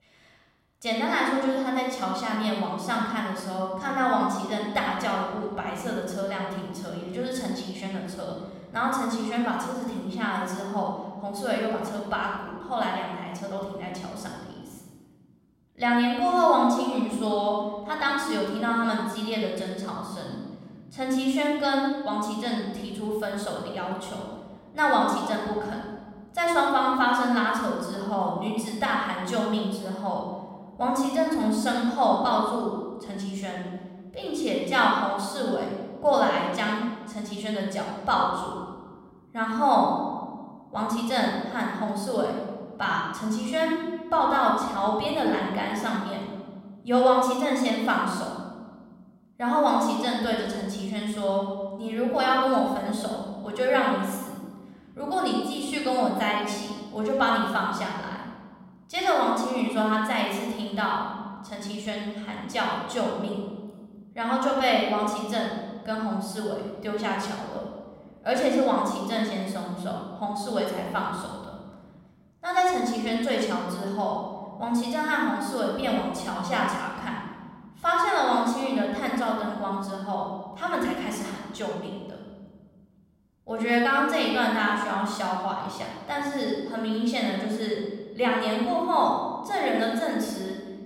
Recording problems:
room echo; noticeable; dies away in 1.8 s
off-mic speech; somewhat distant

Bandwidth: 16 kHz